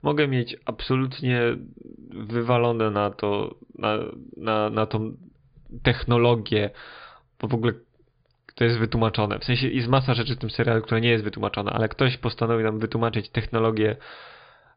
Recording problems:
high frequencies cut off; severe; nothing above 5 kHz

